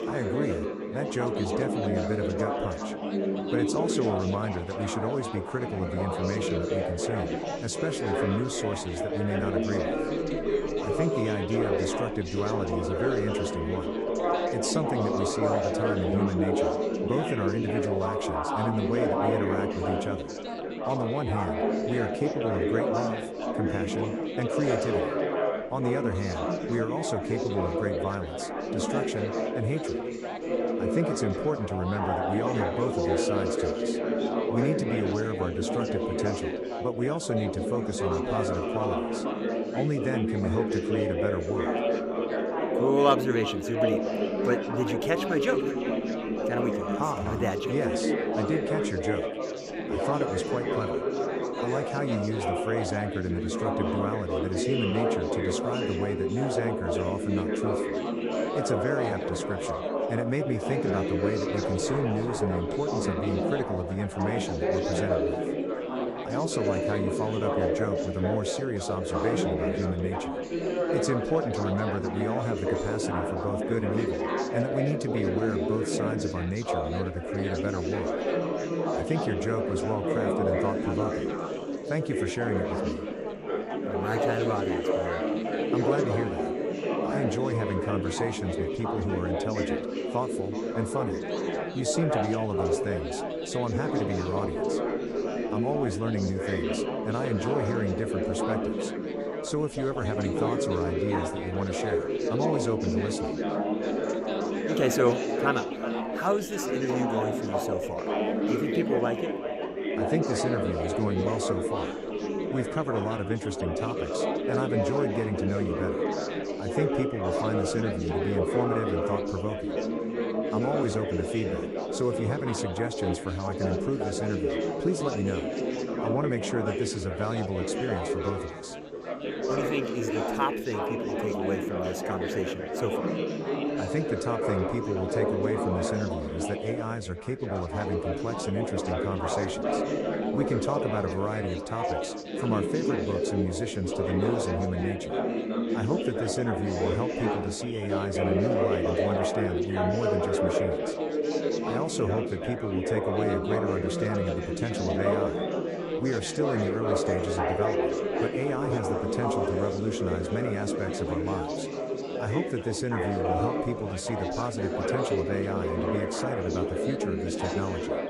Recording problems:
echo of what is said; noticeable; throughout; 370 ms later, 15 dB below the speech
chatter from many people; very loud; throughout; 2 dB above the speech

